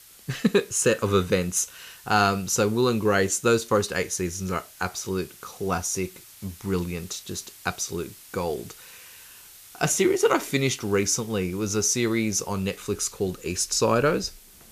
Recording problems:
hiss; faint; throughout; 20 dB below the speech

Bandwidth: 14.5 kHz